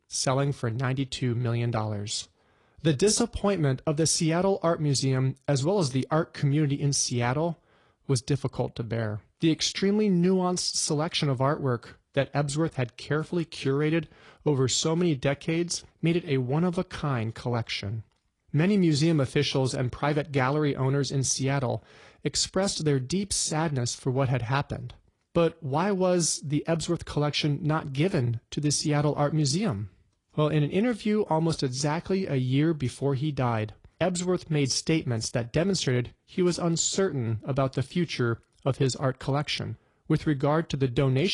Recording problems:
garbled, watery; slightly; nothing above 10 kHz
abrupt cut into speech; at the end

